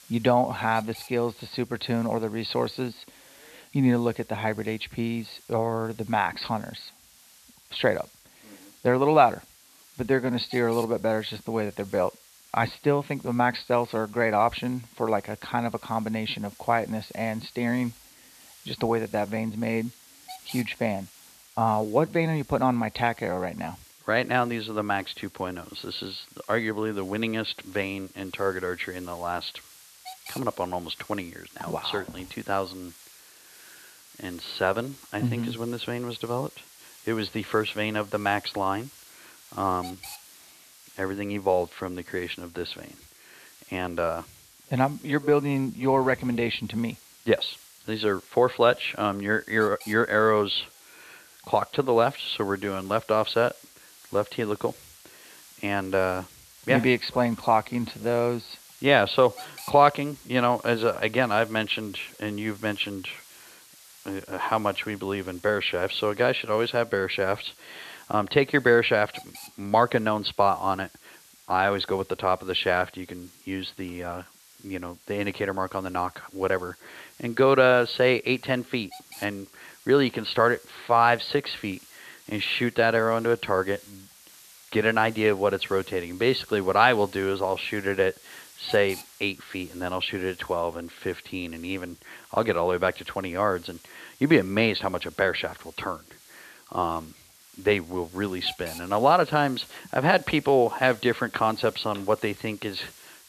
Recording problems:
high frequencies cut off; severe; nothing above 4.5 kHz
hiss; faint; throughout; 25 dB below the speech

